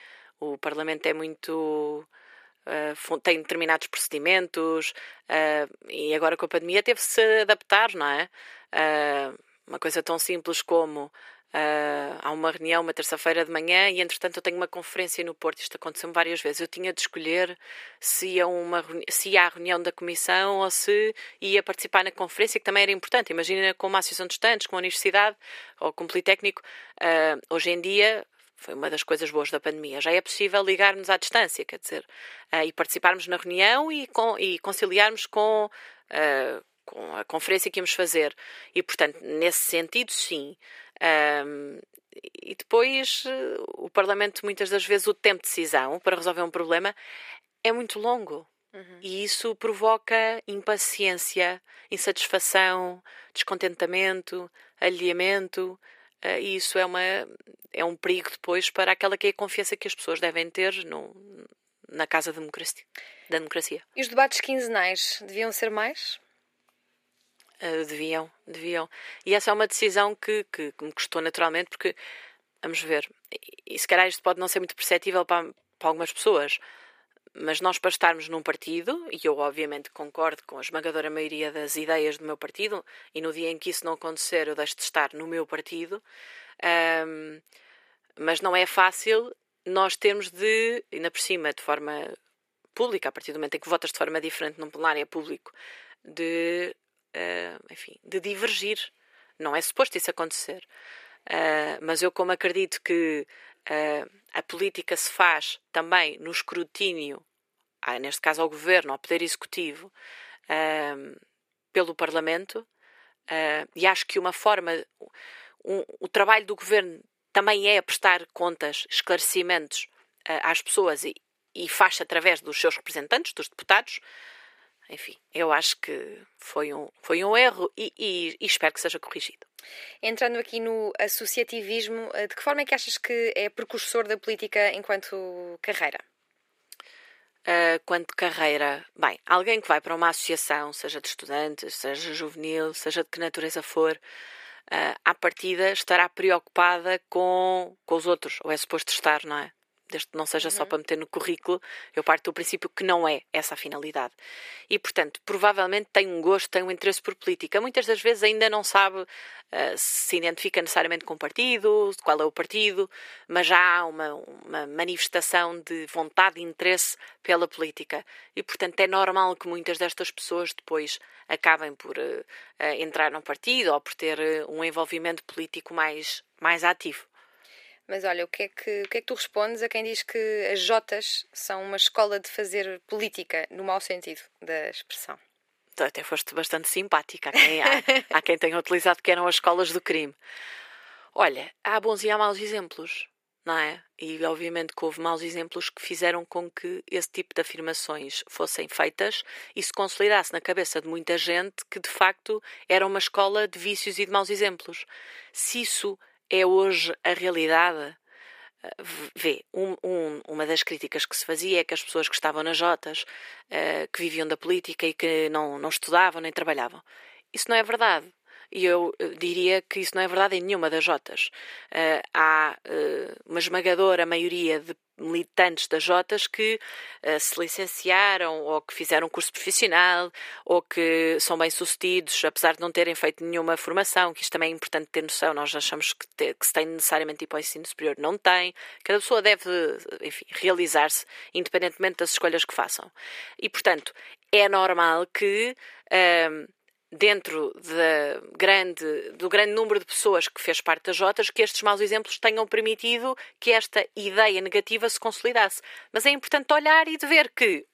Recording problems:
thin; very; fading below 400 Hz

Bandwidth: 15 kHz